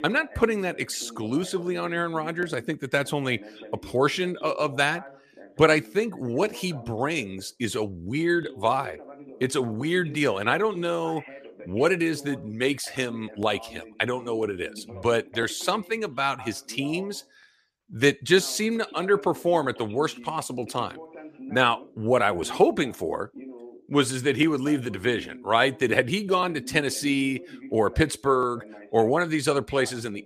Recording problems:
voice in the background; noticeable; throughout; 20 dB below the speech

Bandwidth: 14.5 kHz